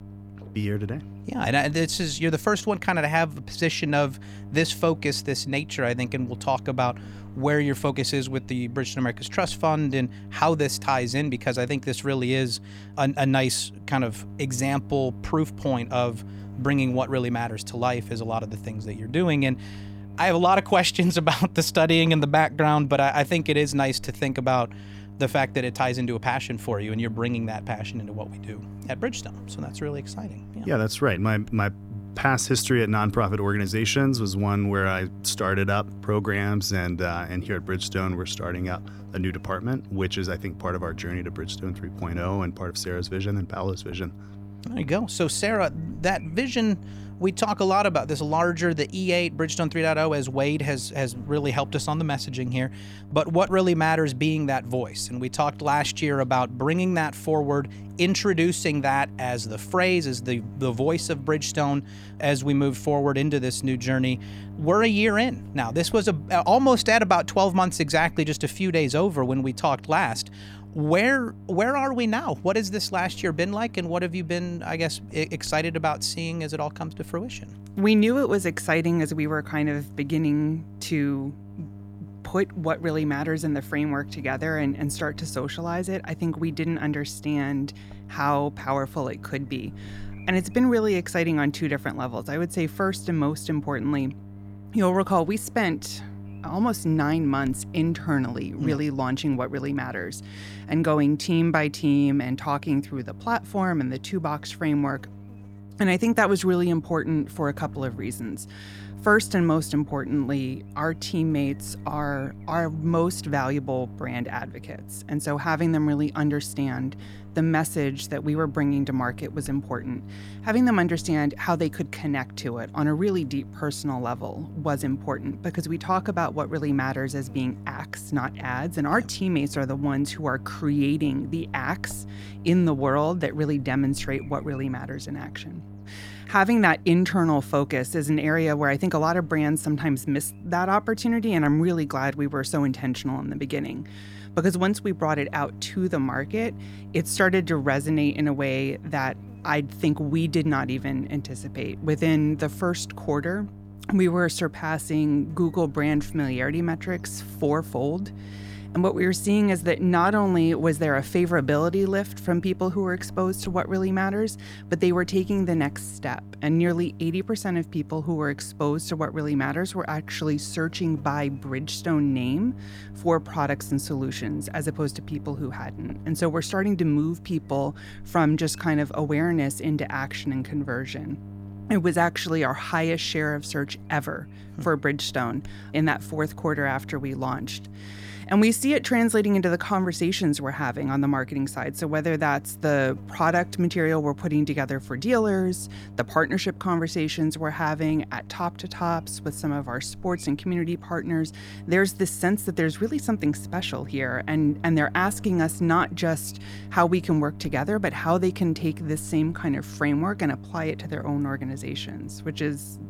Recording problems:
electrical hum; faint; throughout; 50 Hz, 25 dB below the speech

